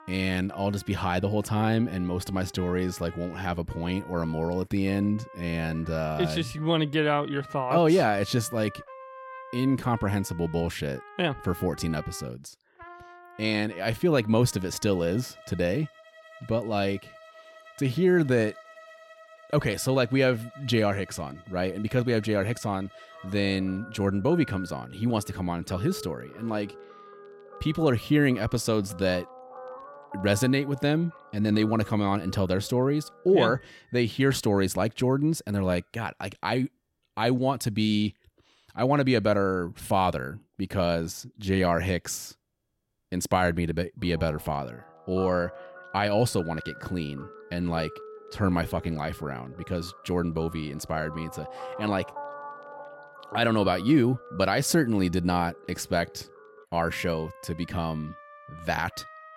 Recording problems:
background music; noticeable; throughout; 20 dB below the speech

